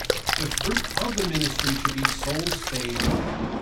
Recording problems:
off-mic speech; far
echo of what is said; faint; throughout; 490 ms later, 20 dB below the speech
room echo; very slight; dies away in 0.2 s
rain or running water; very loud; throughout; 5 dB above the speech
uneven, jittery; slightly; from 0.5 to 3 s

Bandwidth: 16.5 kHz